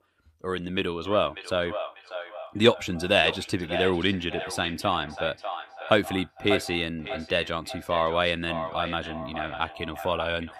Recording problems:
echo of what is said; strong; throughout; 590 ms later, 10 dB below the speech

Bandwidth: 14.5 kHz